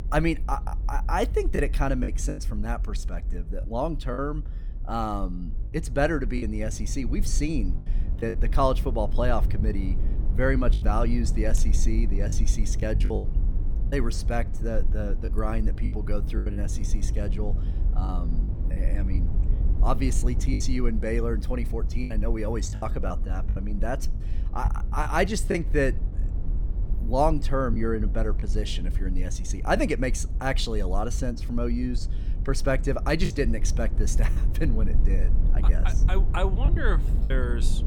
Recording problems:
low rumble; noticeable; throughout; 15 dB below the speech
choppy; very; 5% of the speech affected

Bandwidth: 18 kHz